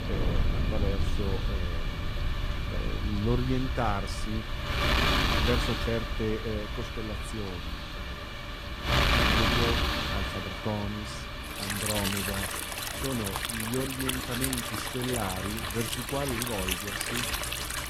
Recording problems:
garbled, watery; slightly; nothing above 15 kHz
rain or running water; very loud; throughout; 1 dB above the speech
wind noise on the microphone; heavy; 5 dB above the speech

